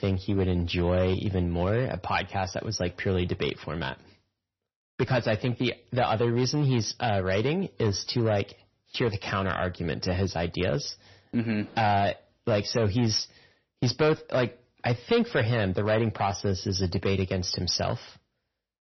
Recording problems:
distortion; slight; 4% of the sound clipped
garbled, watery; slightly; nothing above 6 kHz

